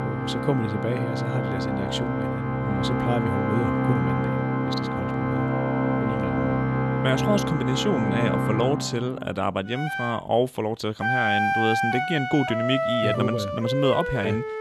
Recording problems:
background music; very loud; throughout; 1 dB above the speech

